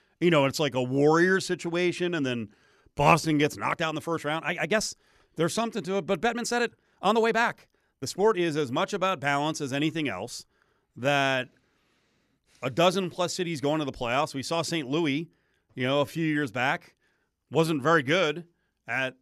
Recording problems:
uneven, jittery; strongly; from 2.5 to 18 s

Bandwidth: 13.5 kHz